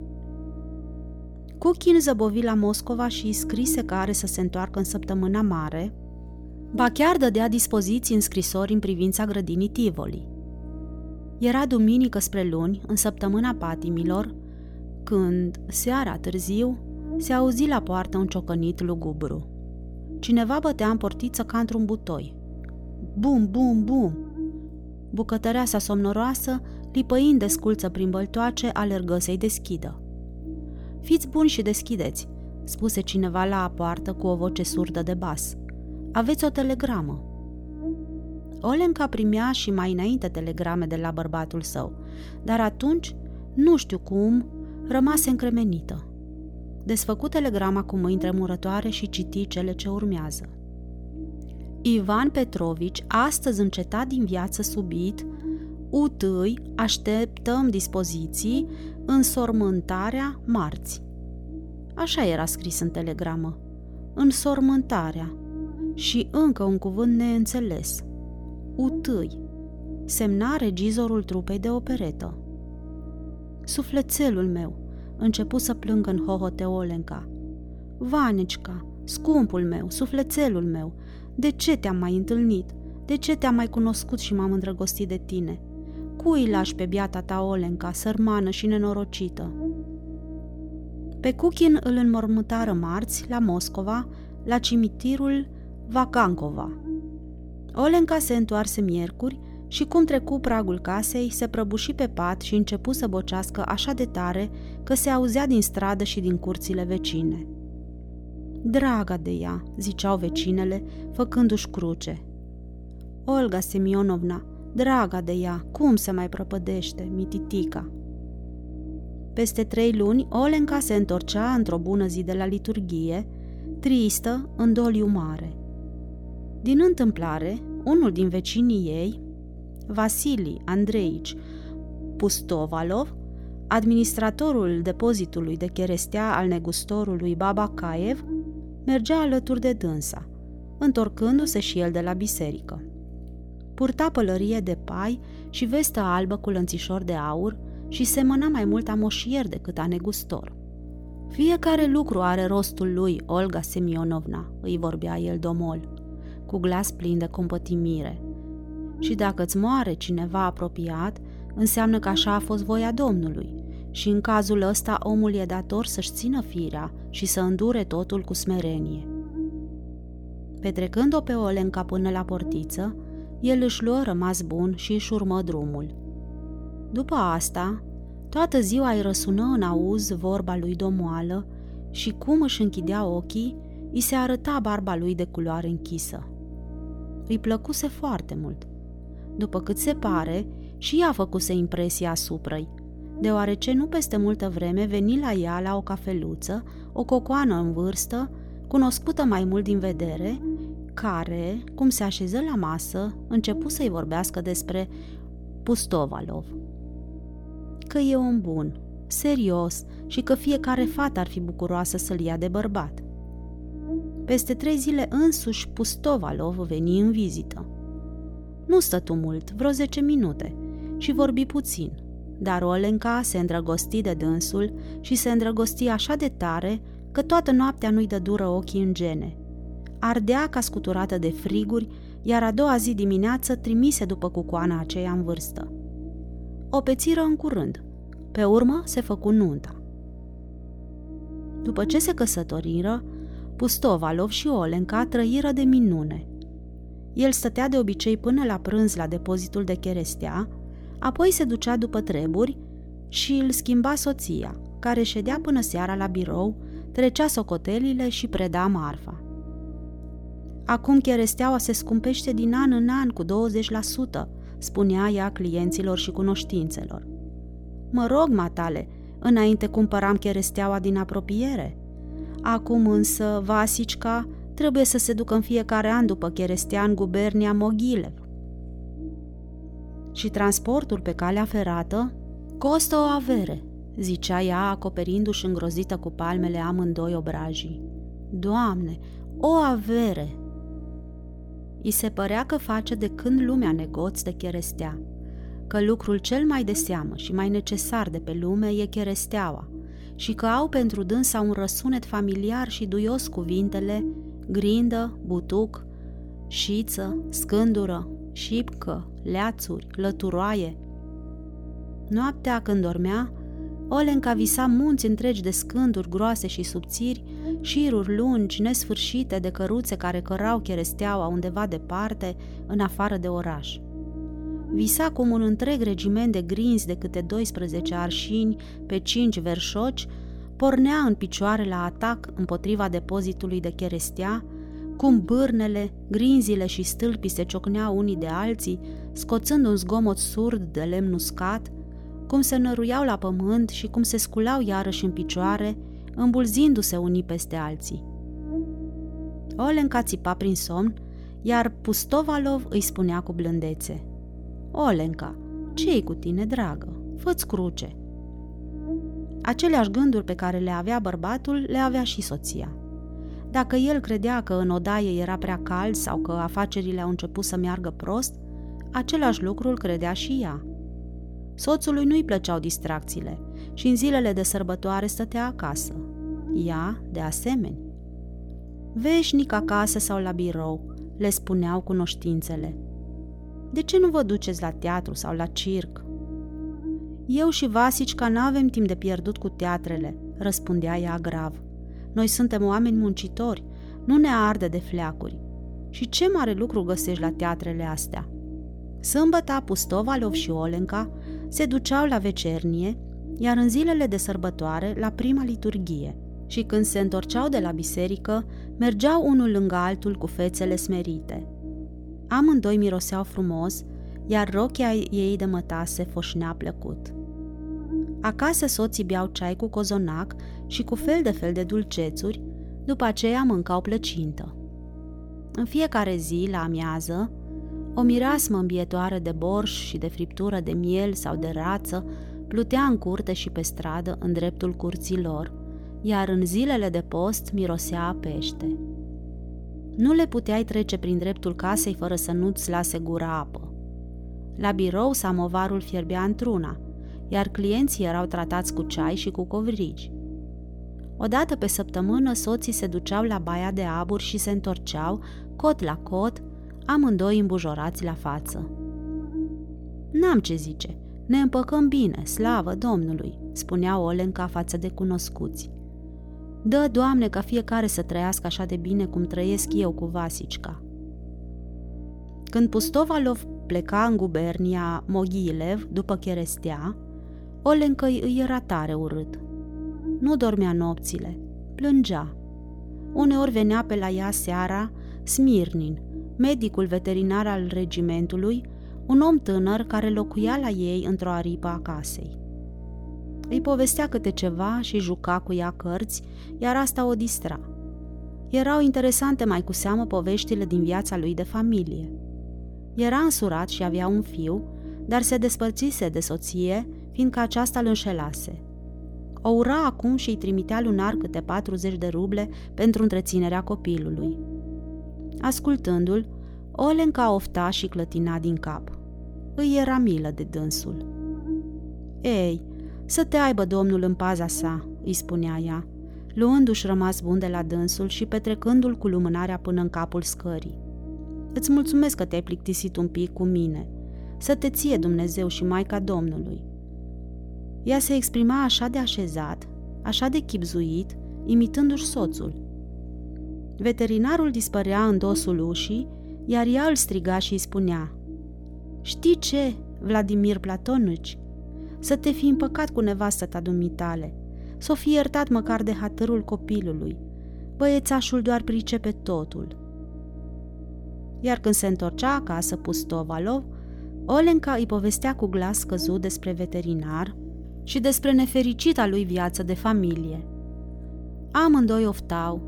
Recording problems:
electrical hum; noticeable; throughout; 60 Hz, 15 dB below the speech

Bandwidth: 18 kHz